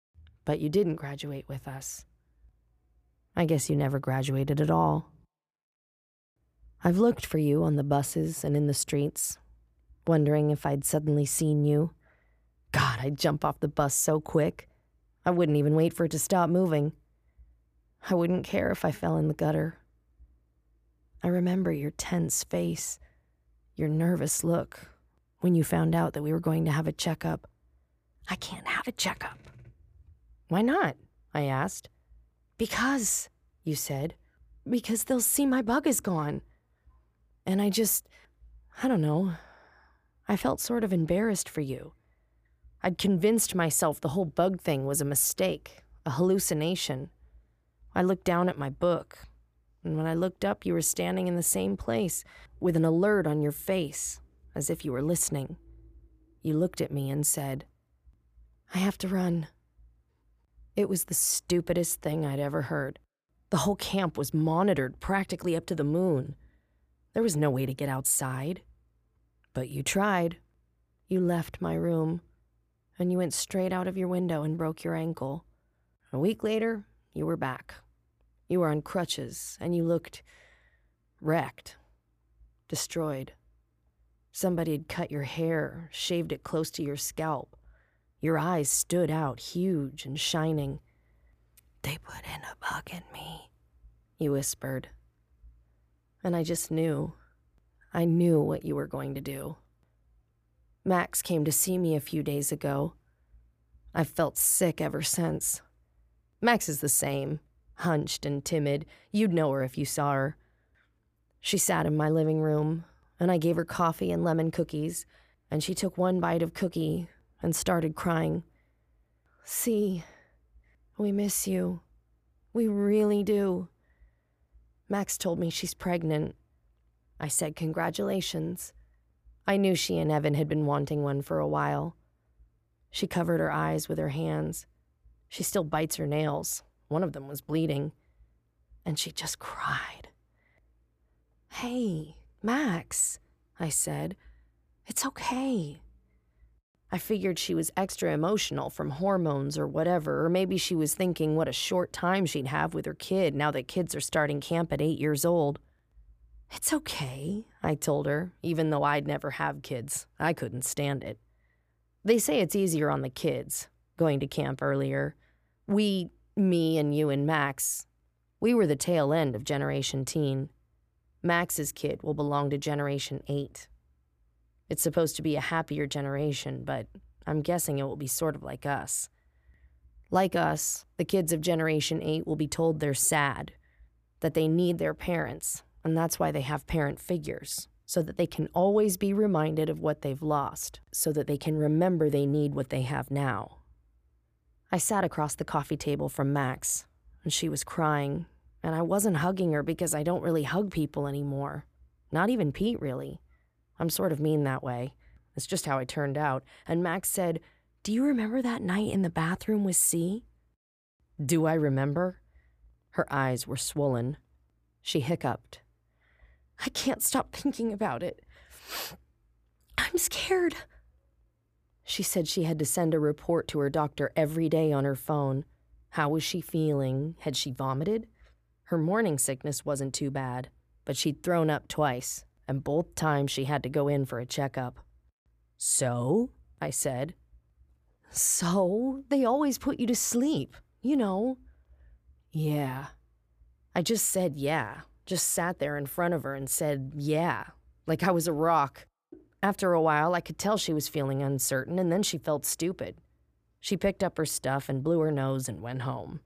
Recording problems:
none

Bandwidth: 15 kHz